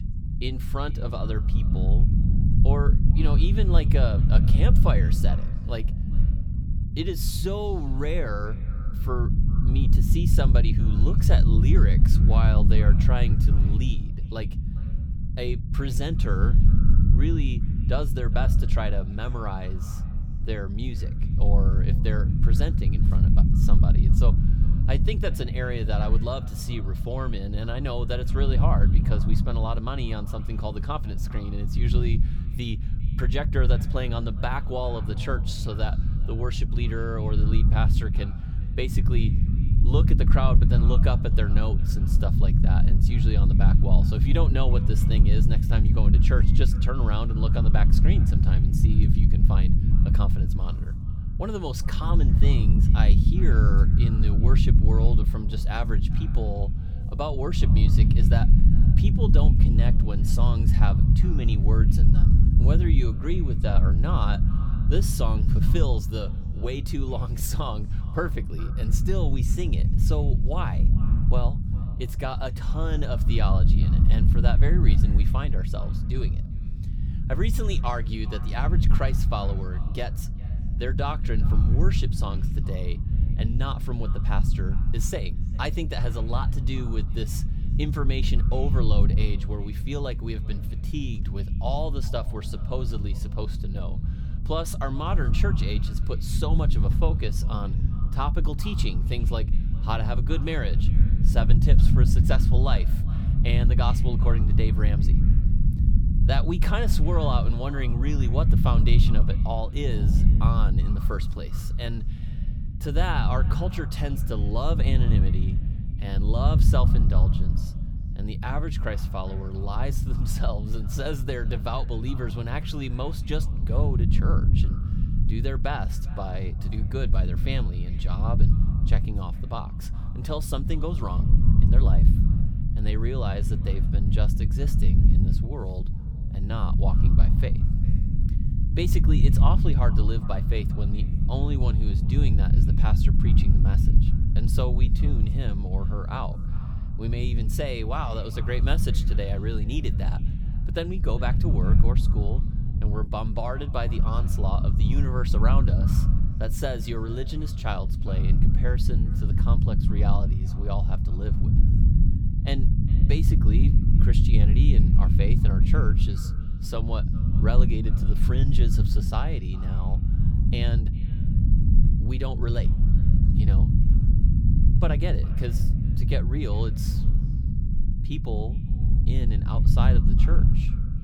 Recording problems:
echo of what is said; faint; throughout; 400 ms later, 20 dB below the speech
low rumble; loud; throughout; 4 dB below the speech

